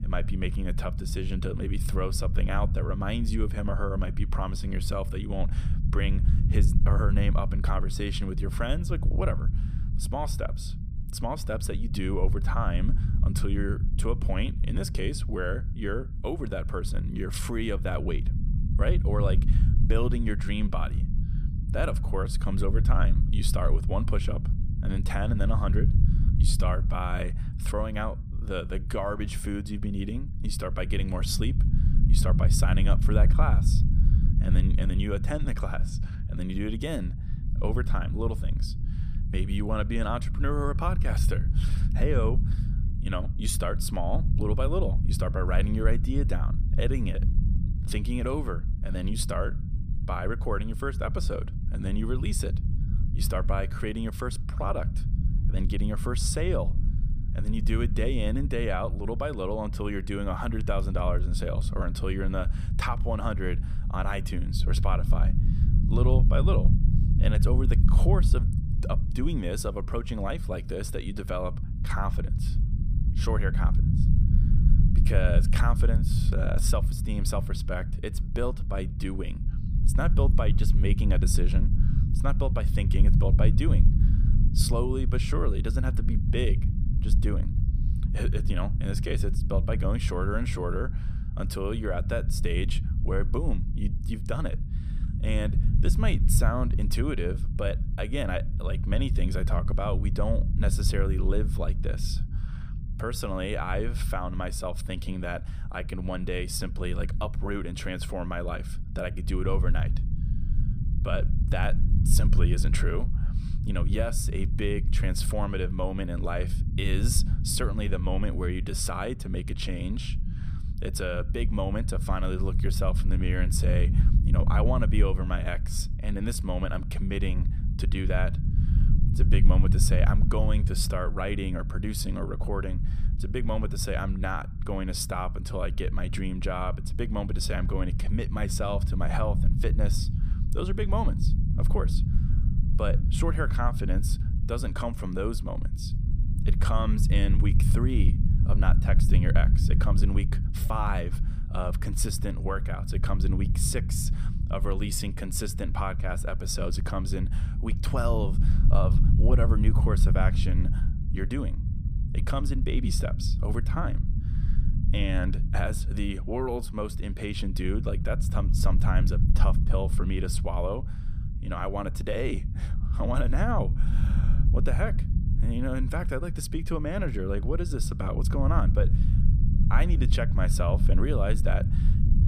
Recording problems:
low rumble; loud; throughout; 9 dB below the speech

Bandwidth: 15 kHz